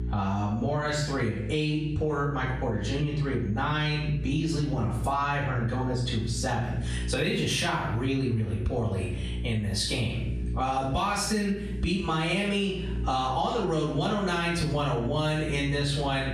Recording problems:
off-mic speech; far
room echo; noticeable; dies away in 0.5 s
squashed, flat; somewhat
electrical hum; faint; throughout; 60 Hz, 20 dB below the speech

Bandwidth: 14 kHz